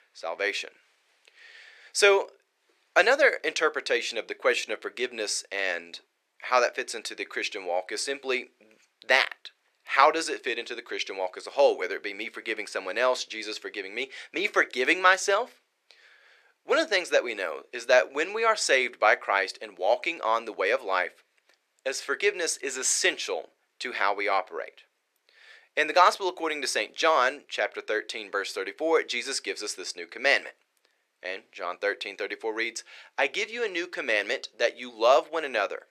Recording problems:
thin; very; fading below 450 Hz

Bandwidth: 14 kHz